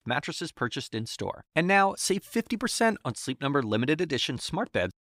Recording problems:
none

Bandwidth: 15.5 kHz